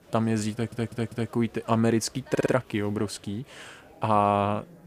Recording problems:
murmuring crowd; faint; throughout; 25 dB below the speech
audio stuttering; at 0.5 s and at 2.5 s

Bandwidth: 15 kHz